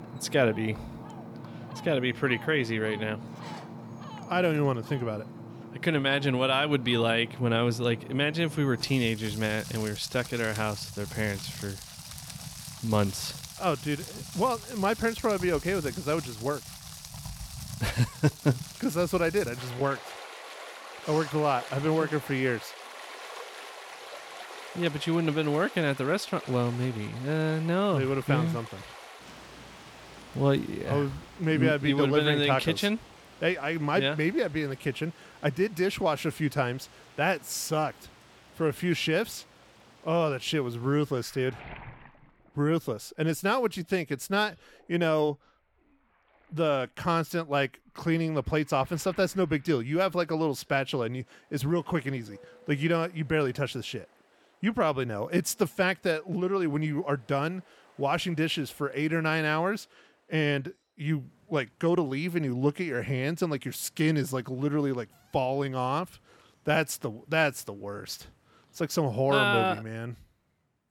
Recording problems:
rain or running water; noticeable; throughout; 15 dB below the speech

